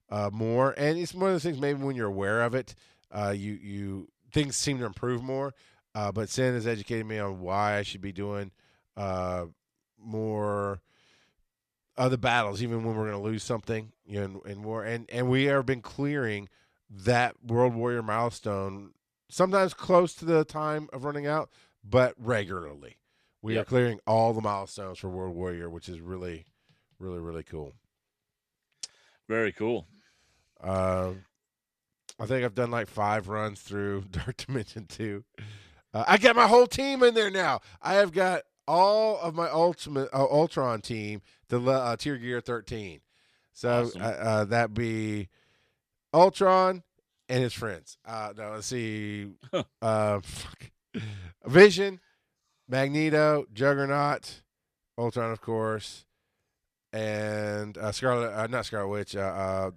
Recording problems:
none

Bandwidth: 14 kHz